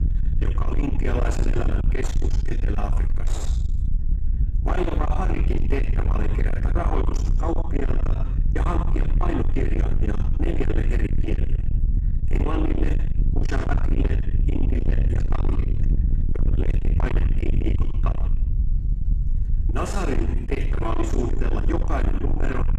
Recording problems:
distortion; heavy; 5 dB below the speech
off-mic speech; far
room echo; noticeable; dies away in 0.8 s
low rumble; loud; throughout; 6 dB below the speech

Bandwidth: 13.5 kHz